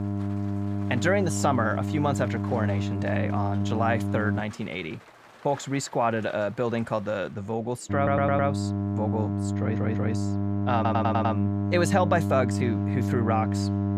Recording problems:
electrical hum; loud; until 4.5 s and from 8 s on; 50 Hz, 8 dB below the speech
rain or running water; faint; throughout; 25 dB below the speech
audio stuttering; at 8 s, at 9.5 s and at 11 s

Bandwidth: 15 kHz